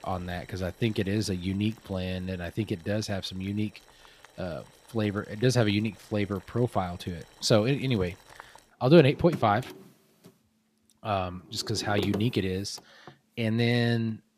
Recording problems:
household noises; noticeable; throughout; 20 dB below the speech

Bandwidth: 14.5 kHz